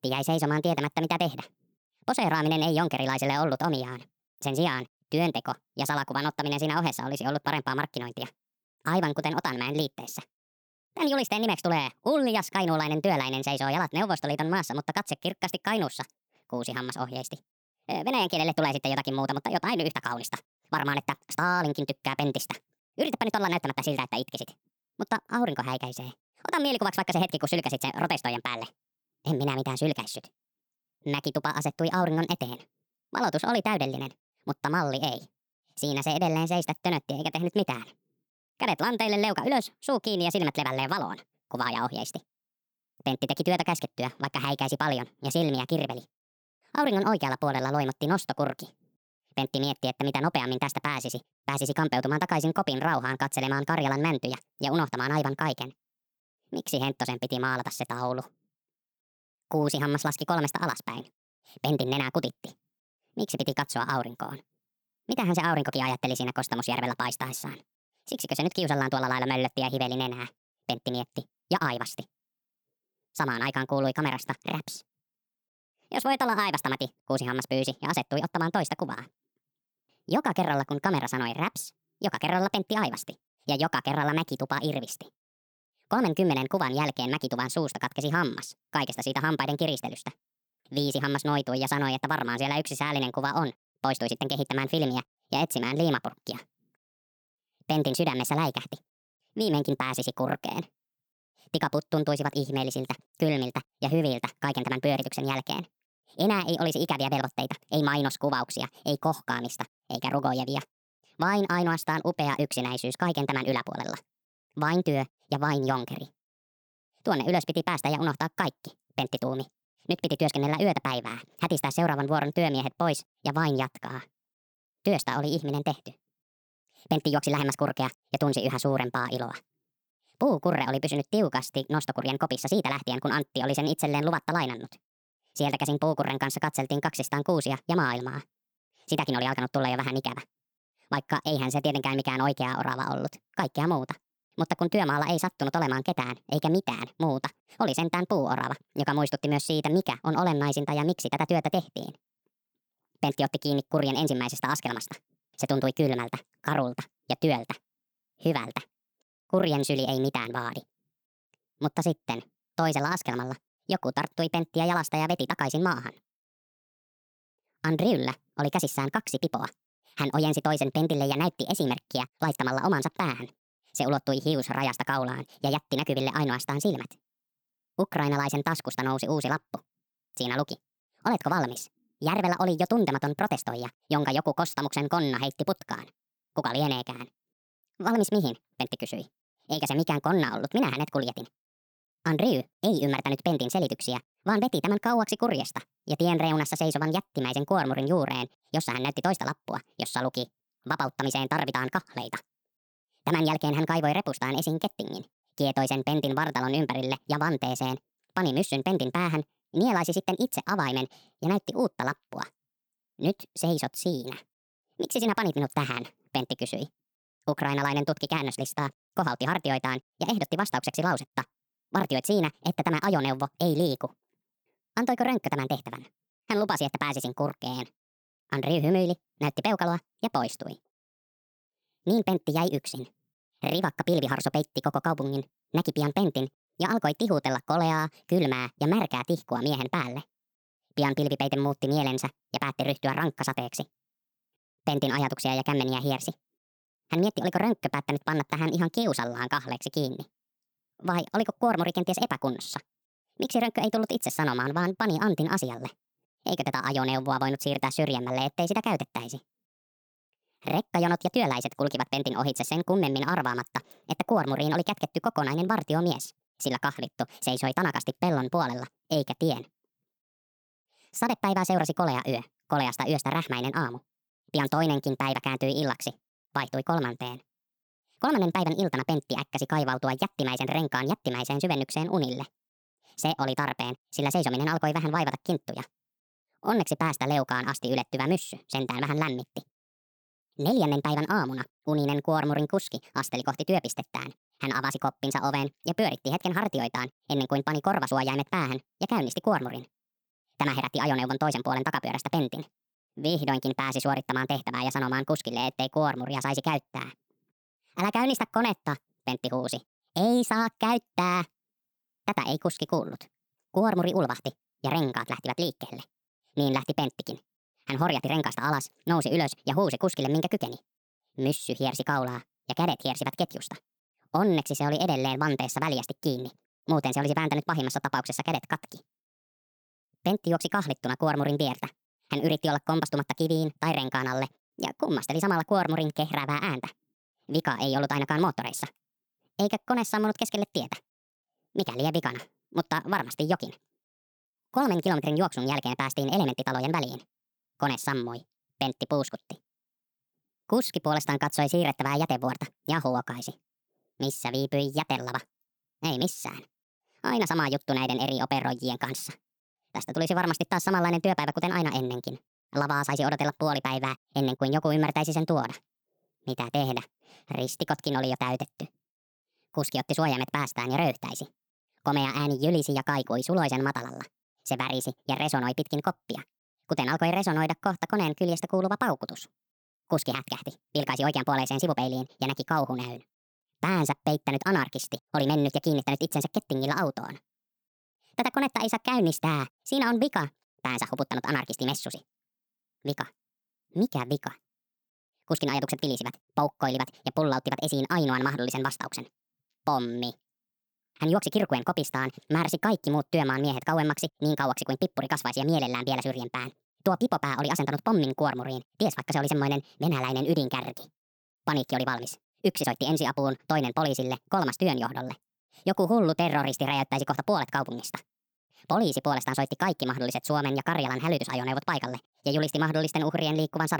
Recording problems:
wrong speed and pitch; too fast and too high; 1.5 times normal speed
abrupt cut into speech; at the end

